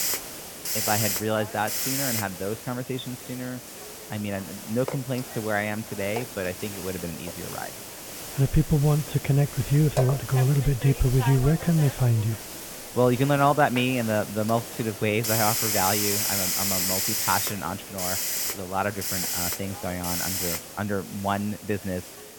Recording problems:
high frequencies cut off; severe; nothing above 4 kHz
hiss; loud; throughout; 2 dB below the speech

